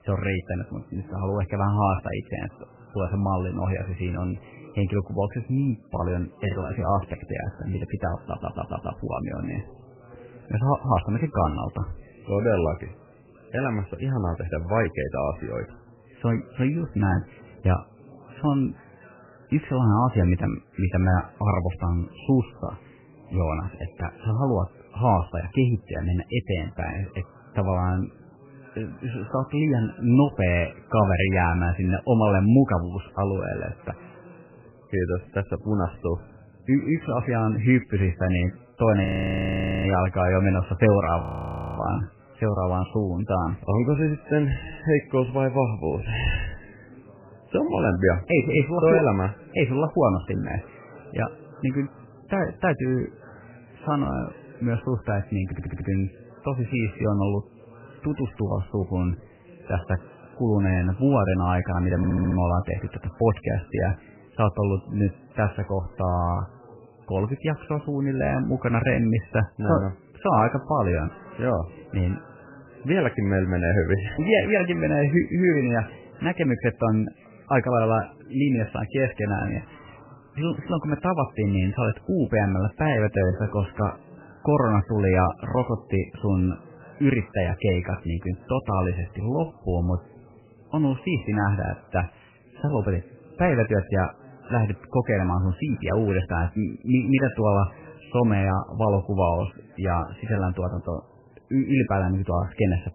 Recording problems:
garbled, watery; badly; nothing above 3 kHz
muffled; very slightly; fading above 3 kHz
chatter from many people; faint; throughout; 25 dB below the speech
audio stuttering; at 8.5 s, at 55 s and at 1:02
audio freezing; at 39 s for 1 s and at 41 s for 0.5 s

